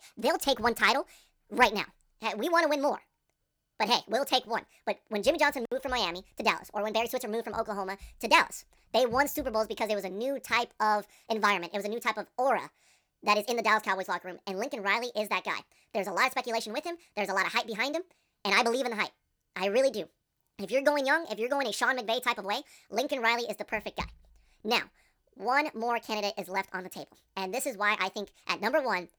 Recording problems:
wrong speed and pitch; too fast and too high; 1.5 times normal speed

